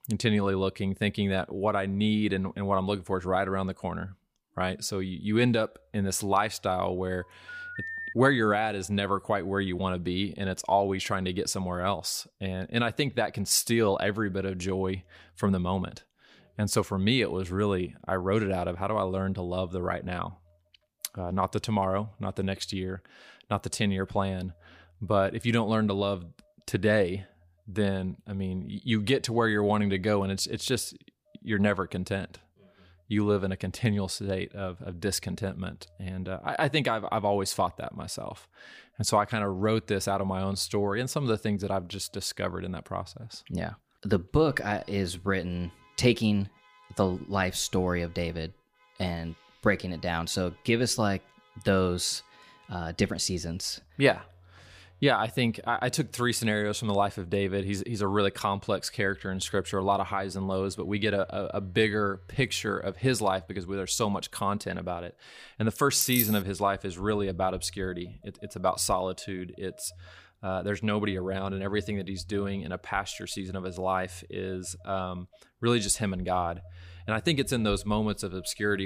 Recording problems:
alarms or sirens; faint; throughout; 25 dB below the speech
phone ringing; noticeable; at 7 s; peak 6 dB below the speech
jangling keys; loud; at 1:06; peak 2 dB above the speech
abrupt cut into speech; at the end

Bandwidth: 15 kHz